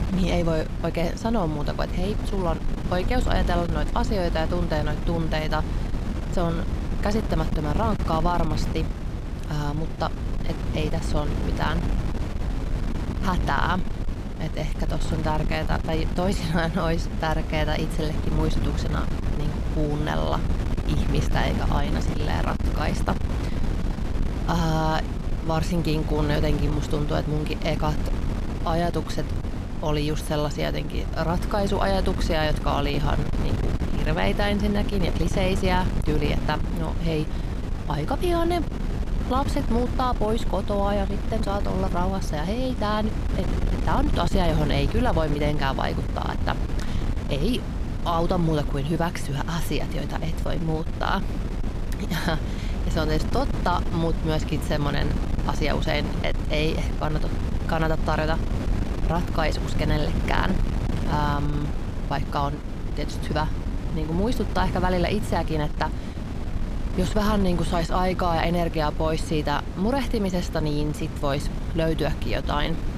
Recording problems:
wind noise on the microphone; heavy; 9 dB below the speech

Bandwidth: 14.5 kHz